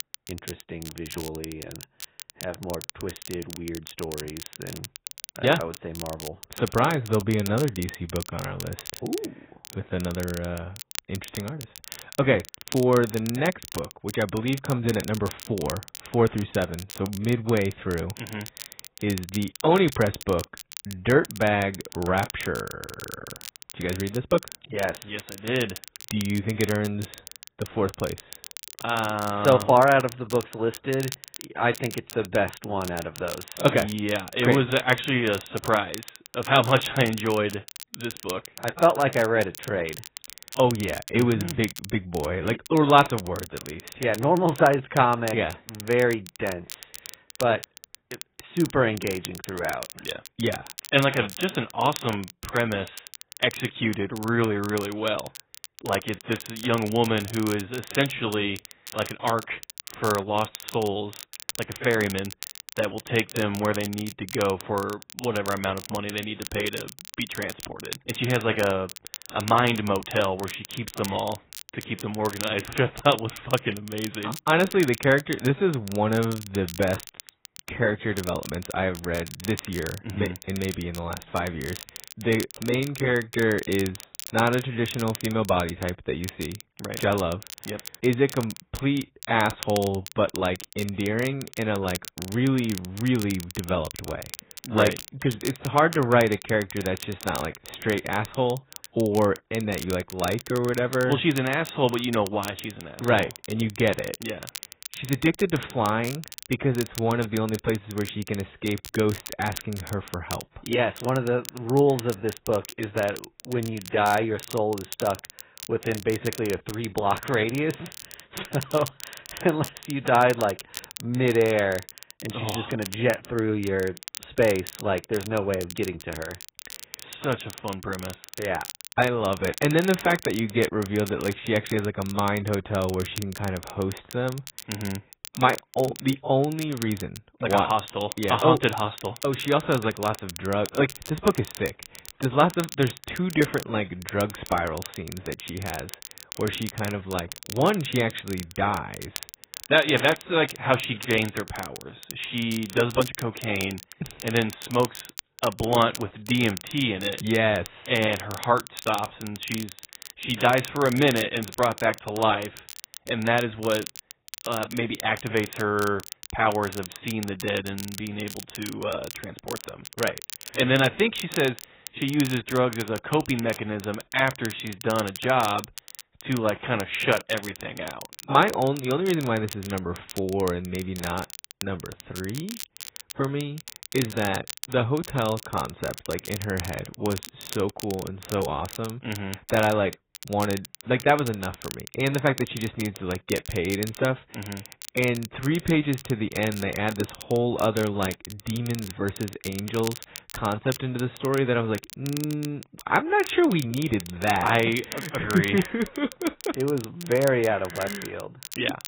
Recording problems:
garbled, watery; badly; nothing above 4 kHz
crackle, like an old record; noticeable; 15 dB below the speech

